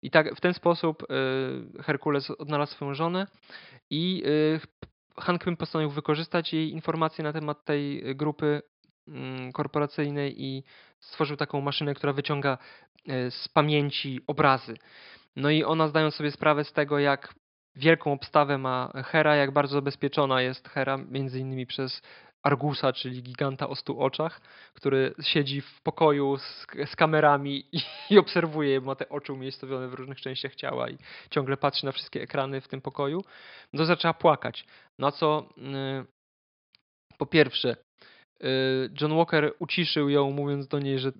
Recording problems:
high frequencies cut off; noticeable; nothing above 5 kHz

